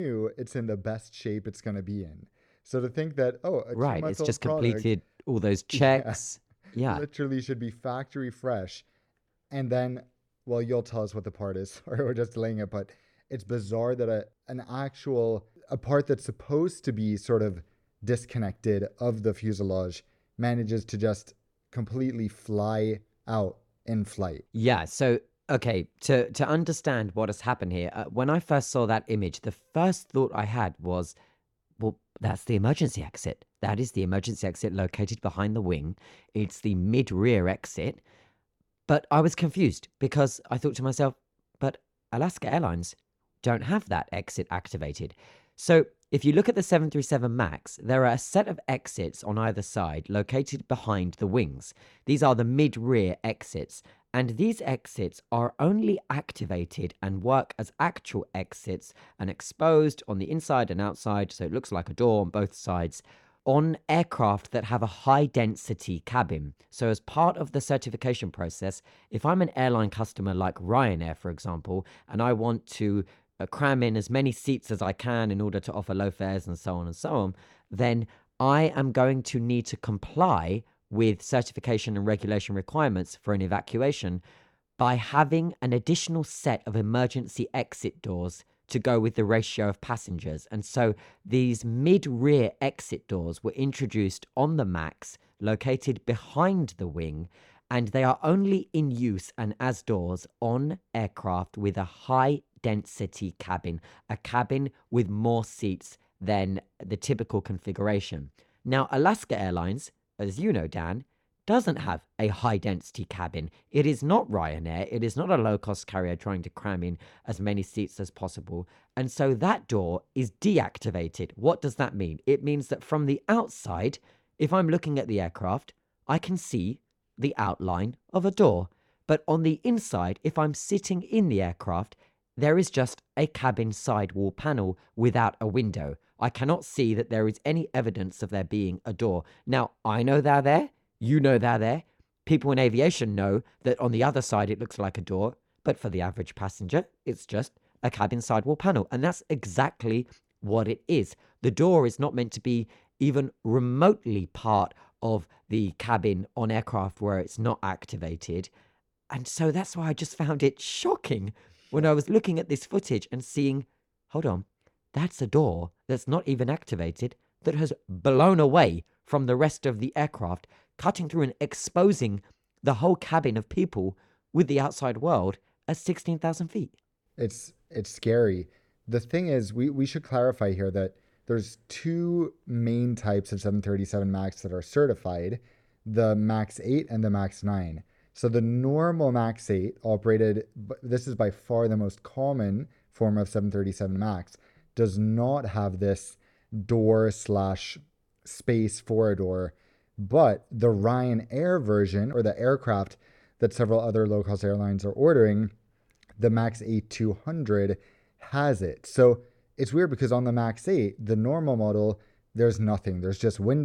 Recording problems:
abrupt cut into speech; at the start and the end

